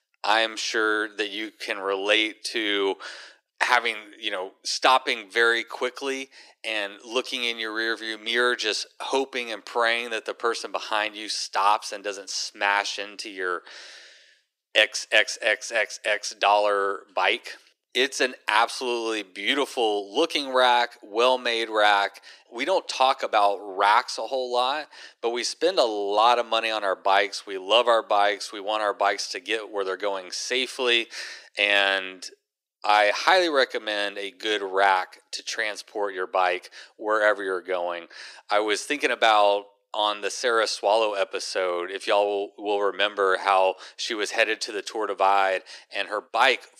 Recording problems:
thin; very; fading below 350 Hz

